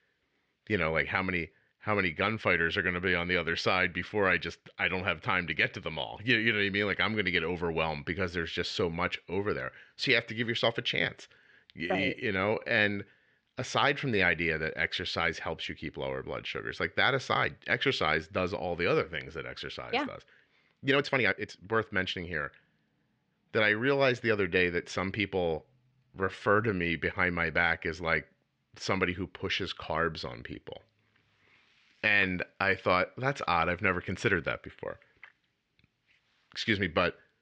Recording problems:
uneven, jittery; strongly; from 12 to 27 s

